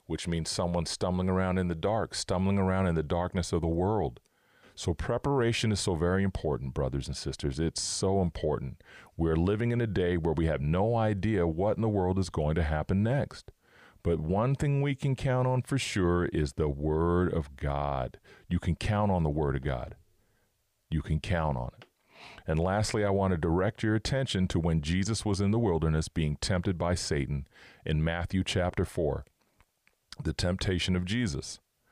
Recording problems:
none

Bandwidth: 15 kHz